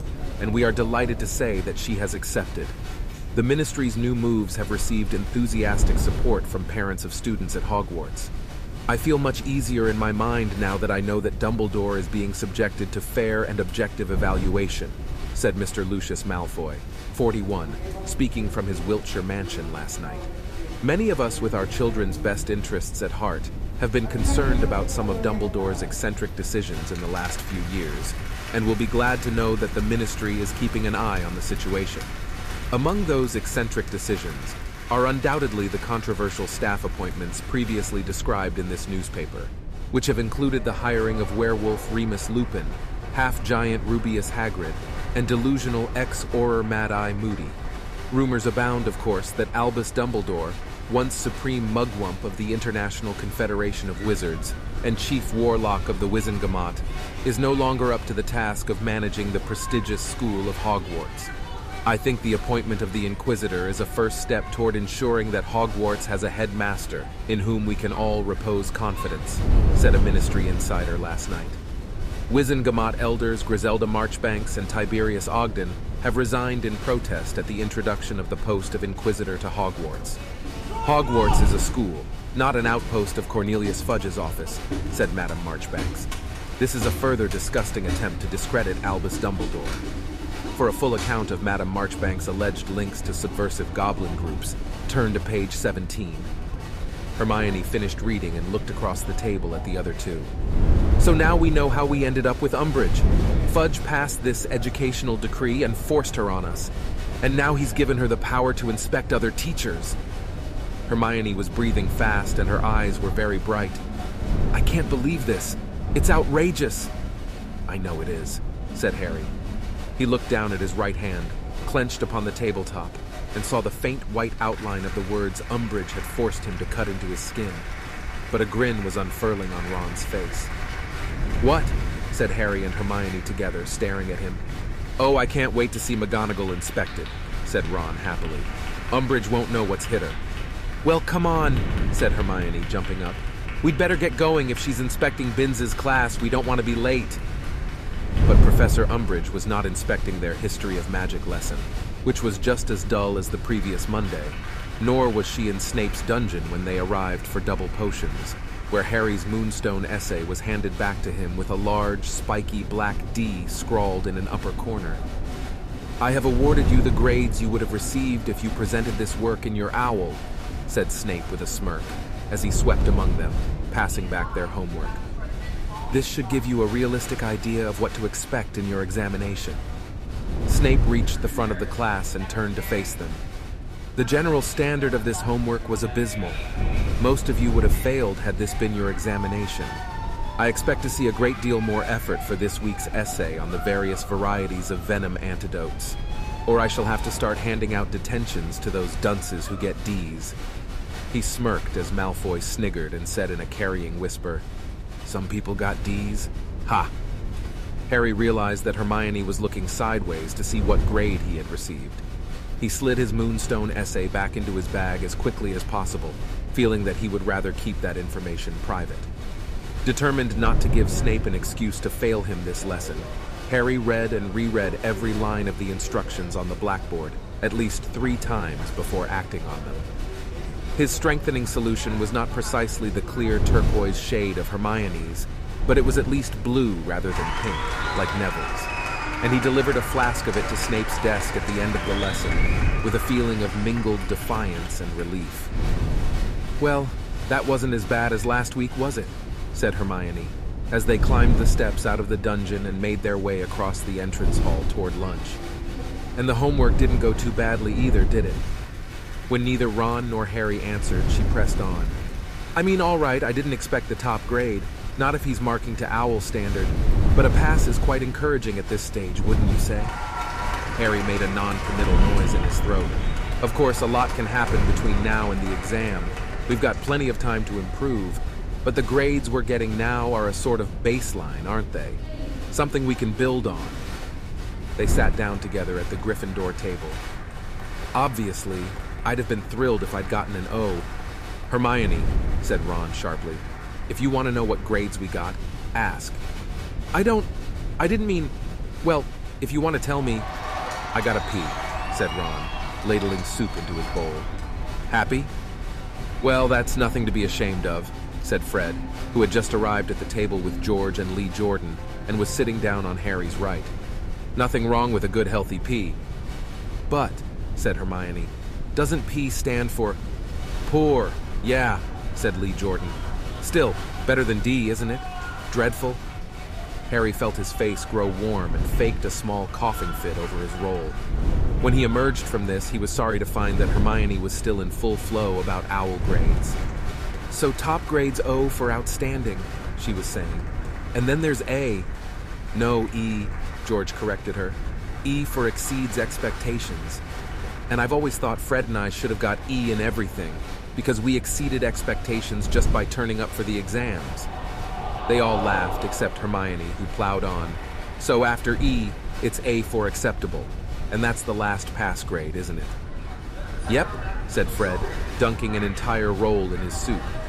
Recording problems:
crowd noise; noticeable; throughout; 10 dB below the speech
wind noise on the microphone; occasional gusts; 15 dB below the speech

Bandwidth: 14.5 kHz